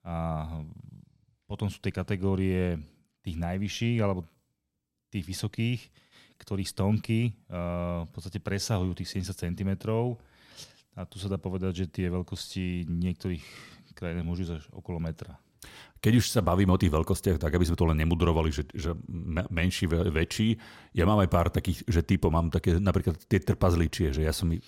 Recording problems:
none

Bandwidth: 16.5 kHz